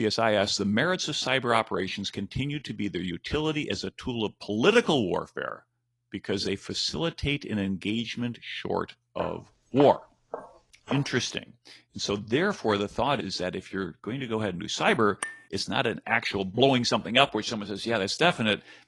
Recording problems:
garbled, watery; slightly; nothing above 10.5 kHz
abrupt cut into speech; at the start
footsteps; noticeable; from 9 to 11 s; peak 10 dB below the speech
clattering dishes; noticeable; at 15 s; peak 9 dB below the speech

